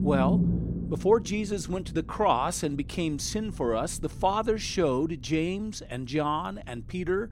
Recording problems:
low rumble; noticeable; throughout; 15 dB below the speech

